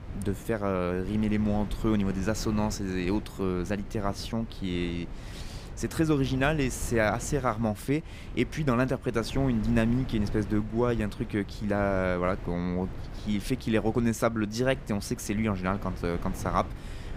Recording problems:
wind noise on the microphone; occasional gusts; 15 dB below the speech

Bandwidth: 15.5 kHz